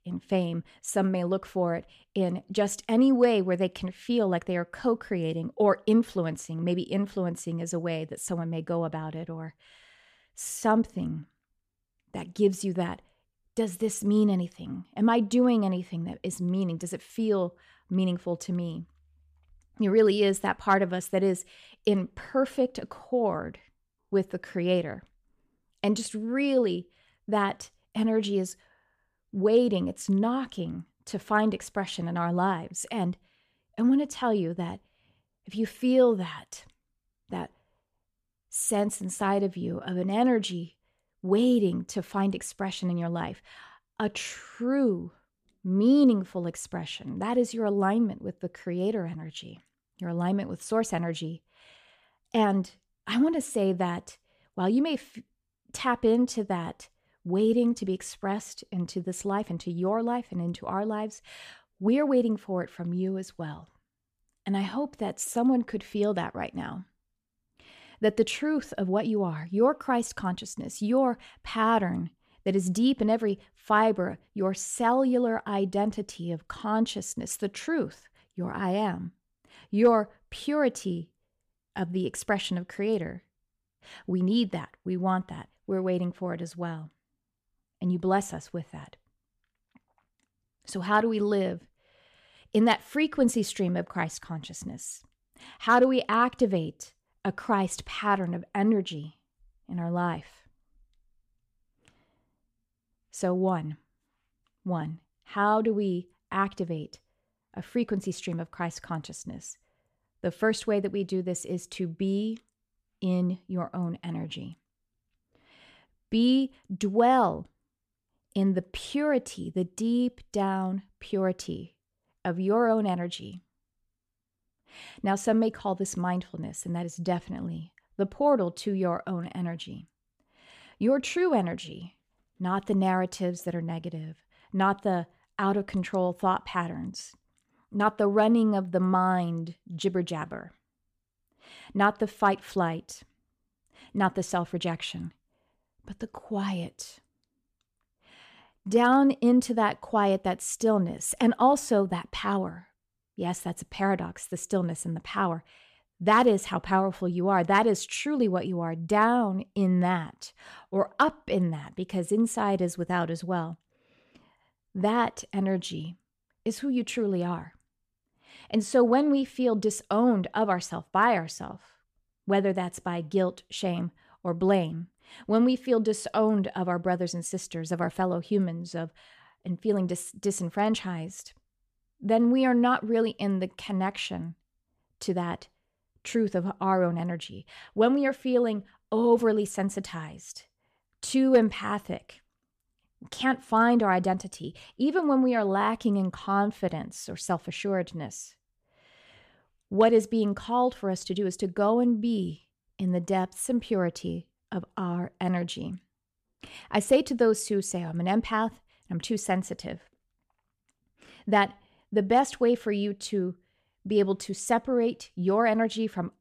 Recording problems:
none

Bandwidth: 14.5 kHz